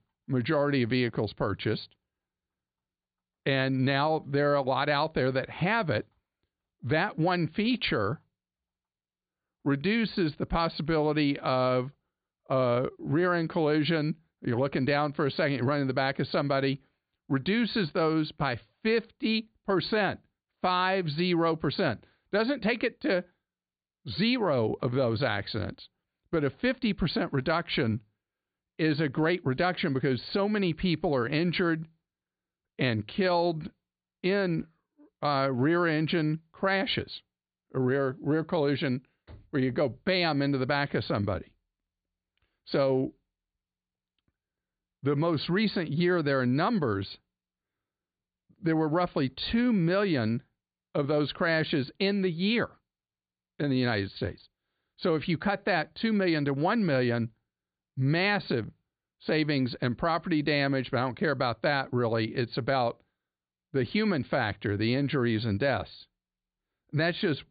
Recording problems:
high frequencies cut off; severe; nothing above 4.5 kHz

